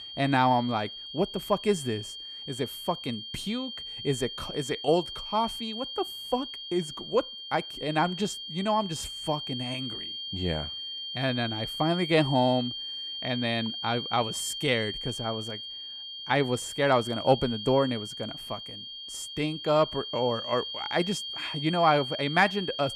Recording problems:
high-pitched whine; loud; throughout; 3 kHz, 7 dB below the speech

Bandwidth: 14.5 kHz